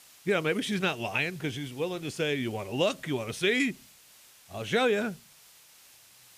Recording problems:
hiss; faint; throughout; 25 dB below the speech

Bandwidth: 15 kHz